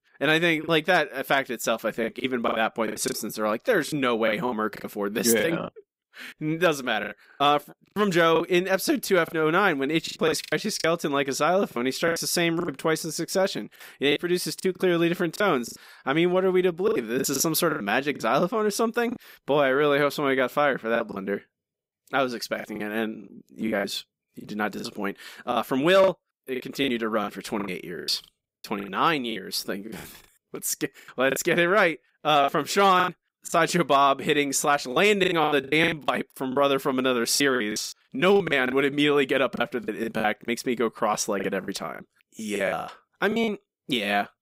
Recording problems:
choppy; very; 12% of the speech affected

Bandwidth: 15.5 kHz